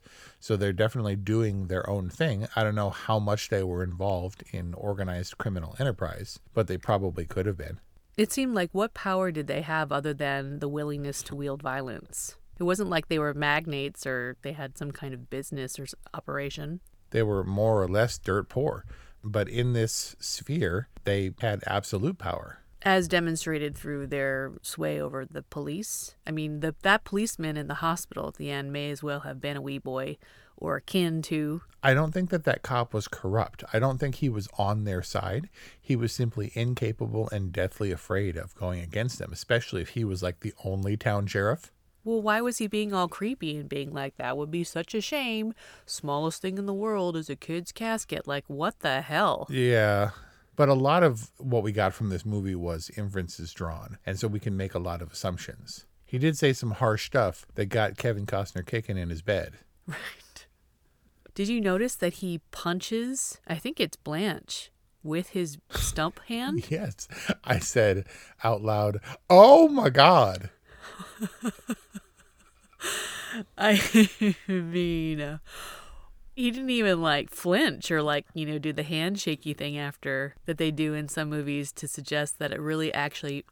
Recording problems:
none

